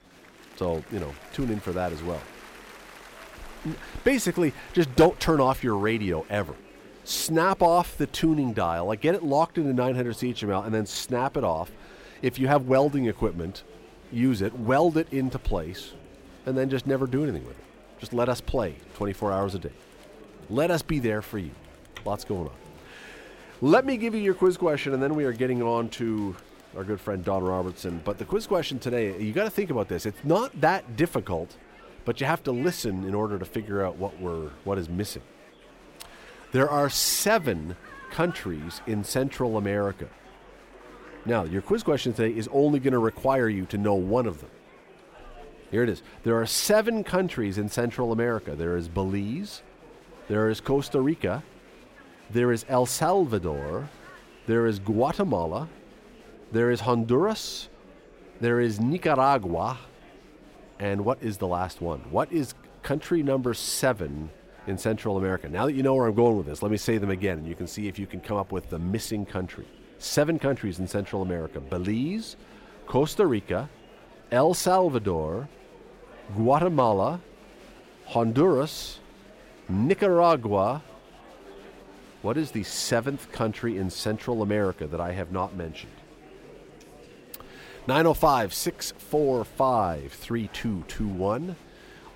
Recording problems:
murmuring crowd; faint; throughout; 25 dB below the speech

